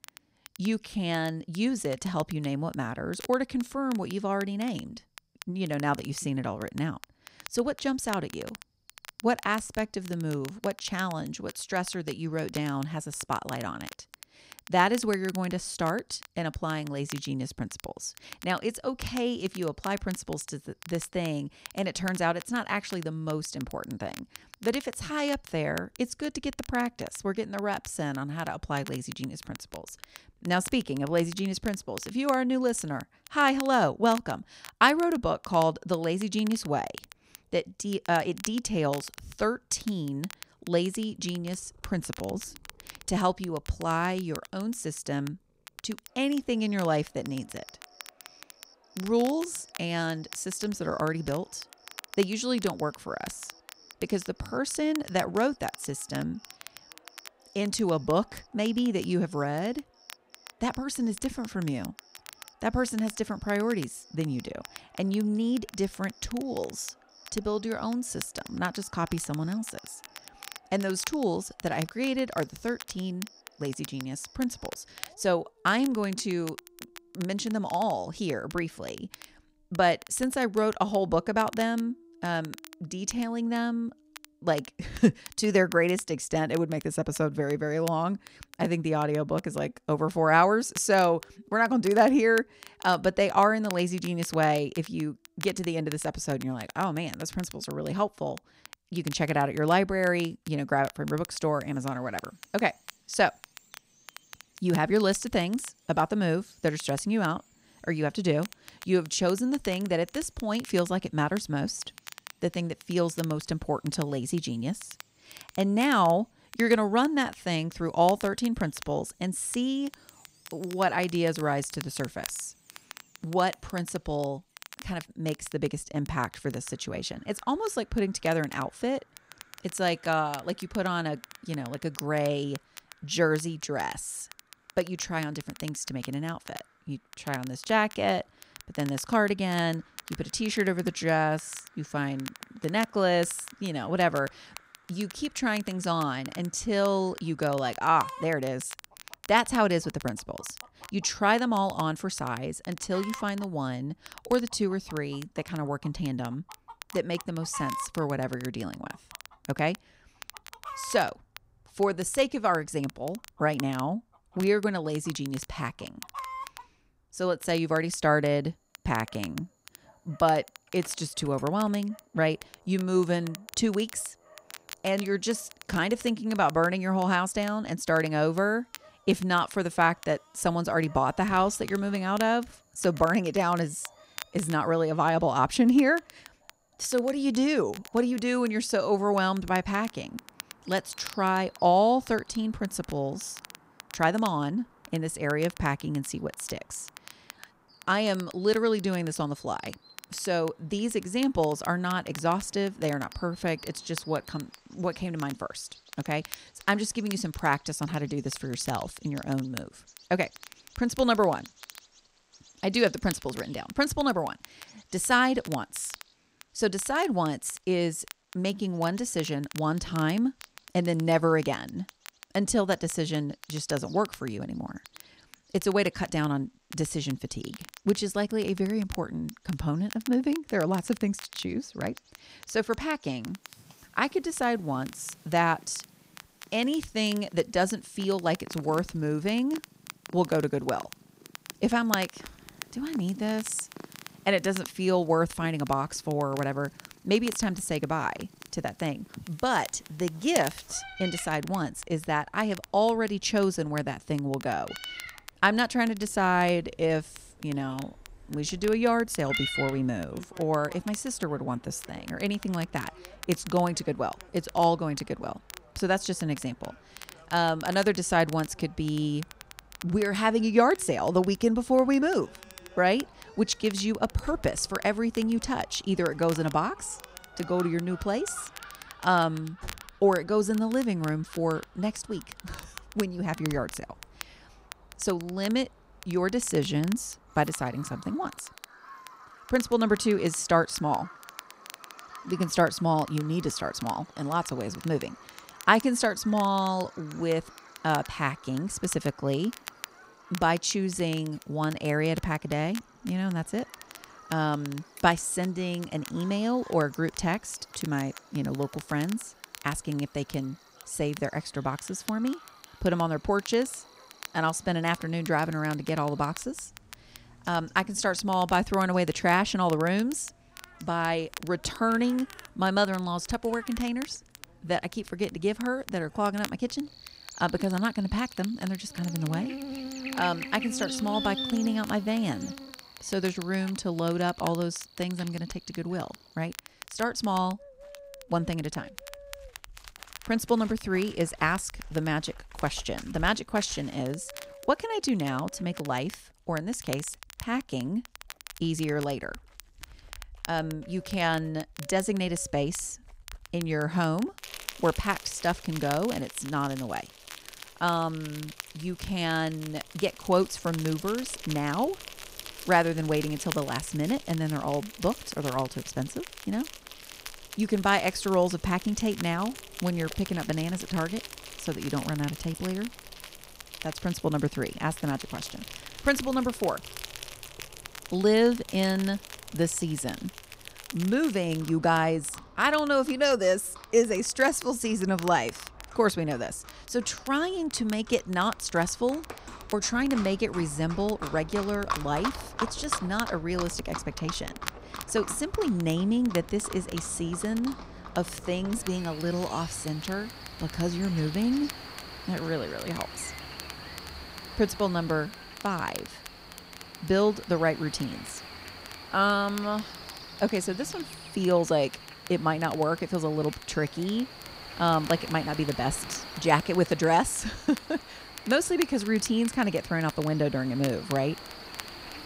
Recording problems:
animal sounds; noticeable; throughout; 15 dB below the speech
crackle, like an old record; noticeable; 20 dB below the speech

